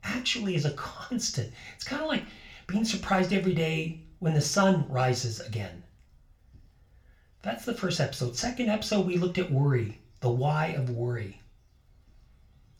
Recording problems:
room echo; very slight; dies away in 0.3 s
off-mic speech; somewhat distant

